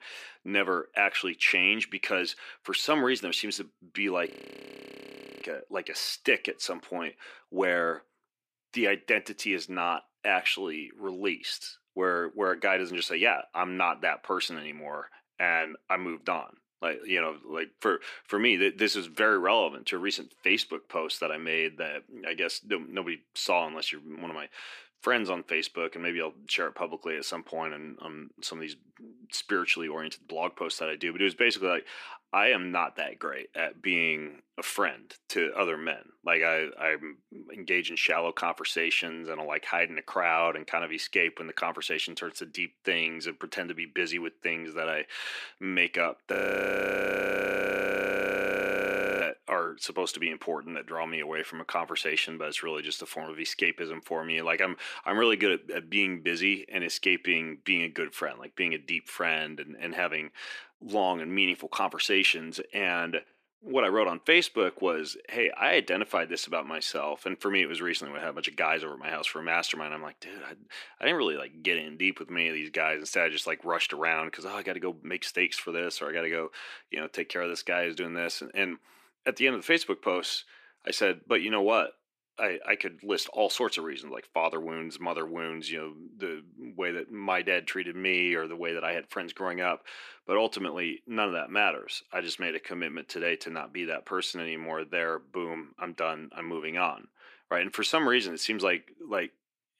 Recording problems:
thin; somewhat; fading below 300 Hz
audio freezing; at 4.5 s for 1 s and at 46 s for 3 s

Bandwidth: 14.5 kHz